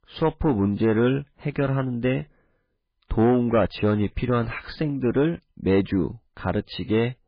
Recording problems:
garbled, watery; badly; nothing above 4 kHz
distortion; slight; 10 dB below the speech

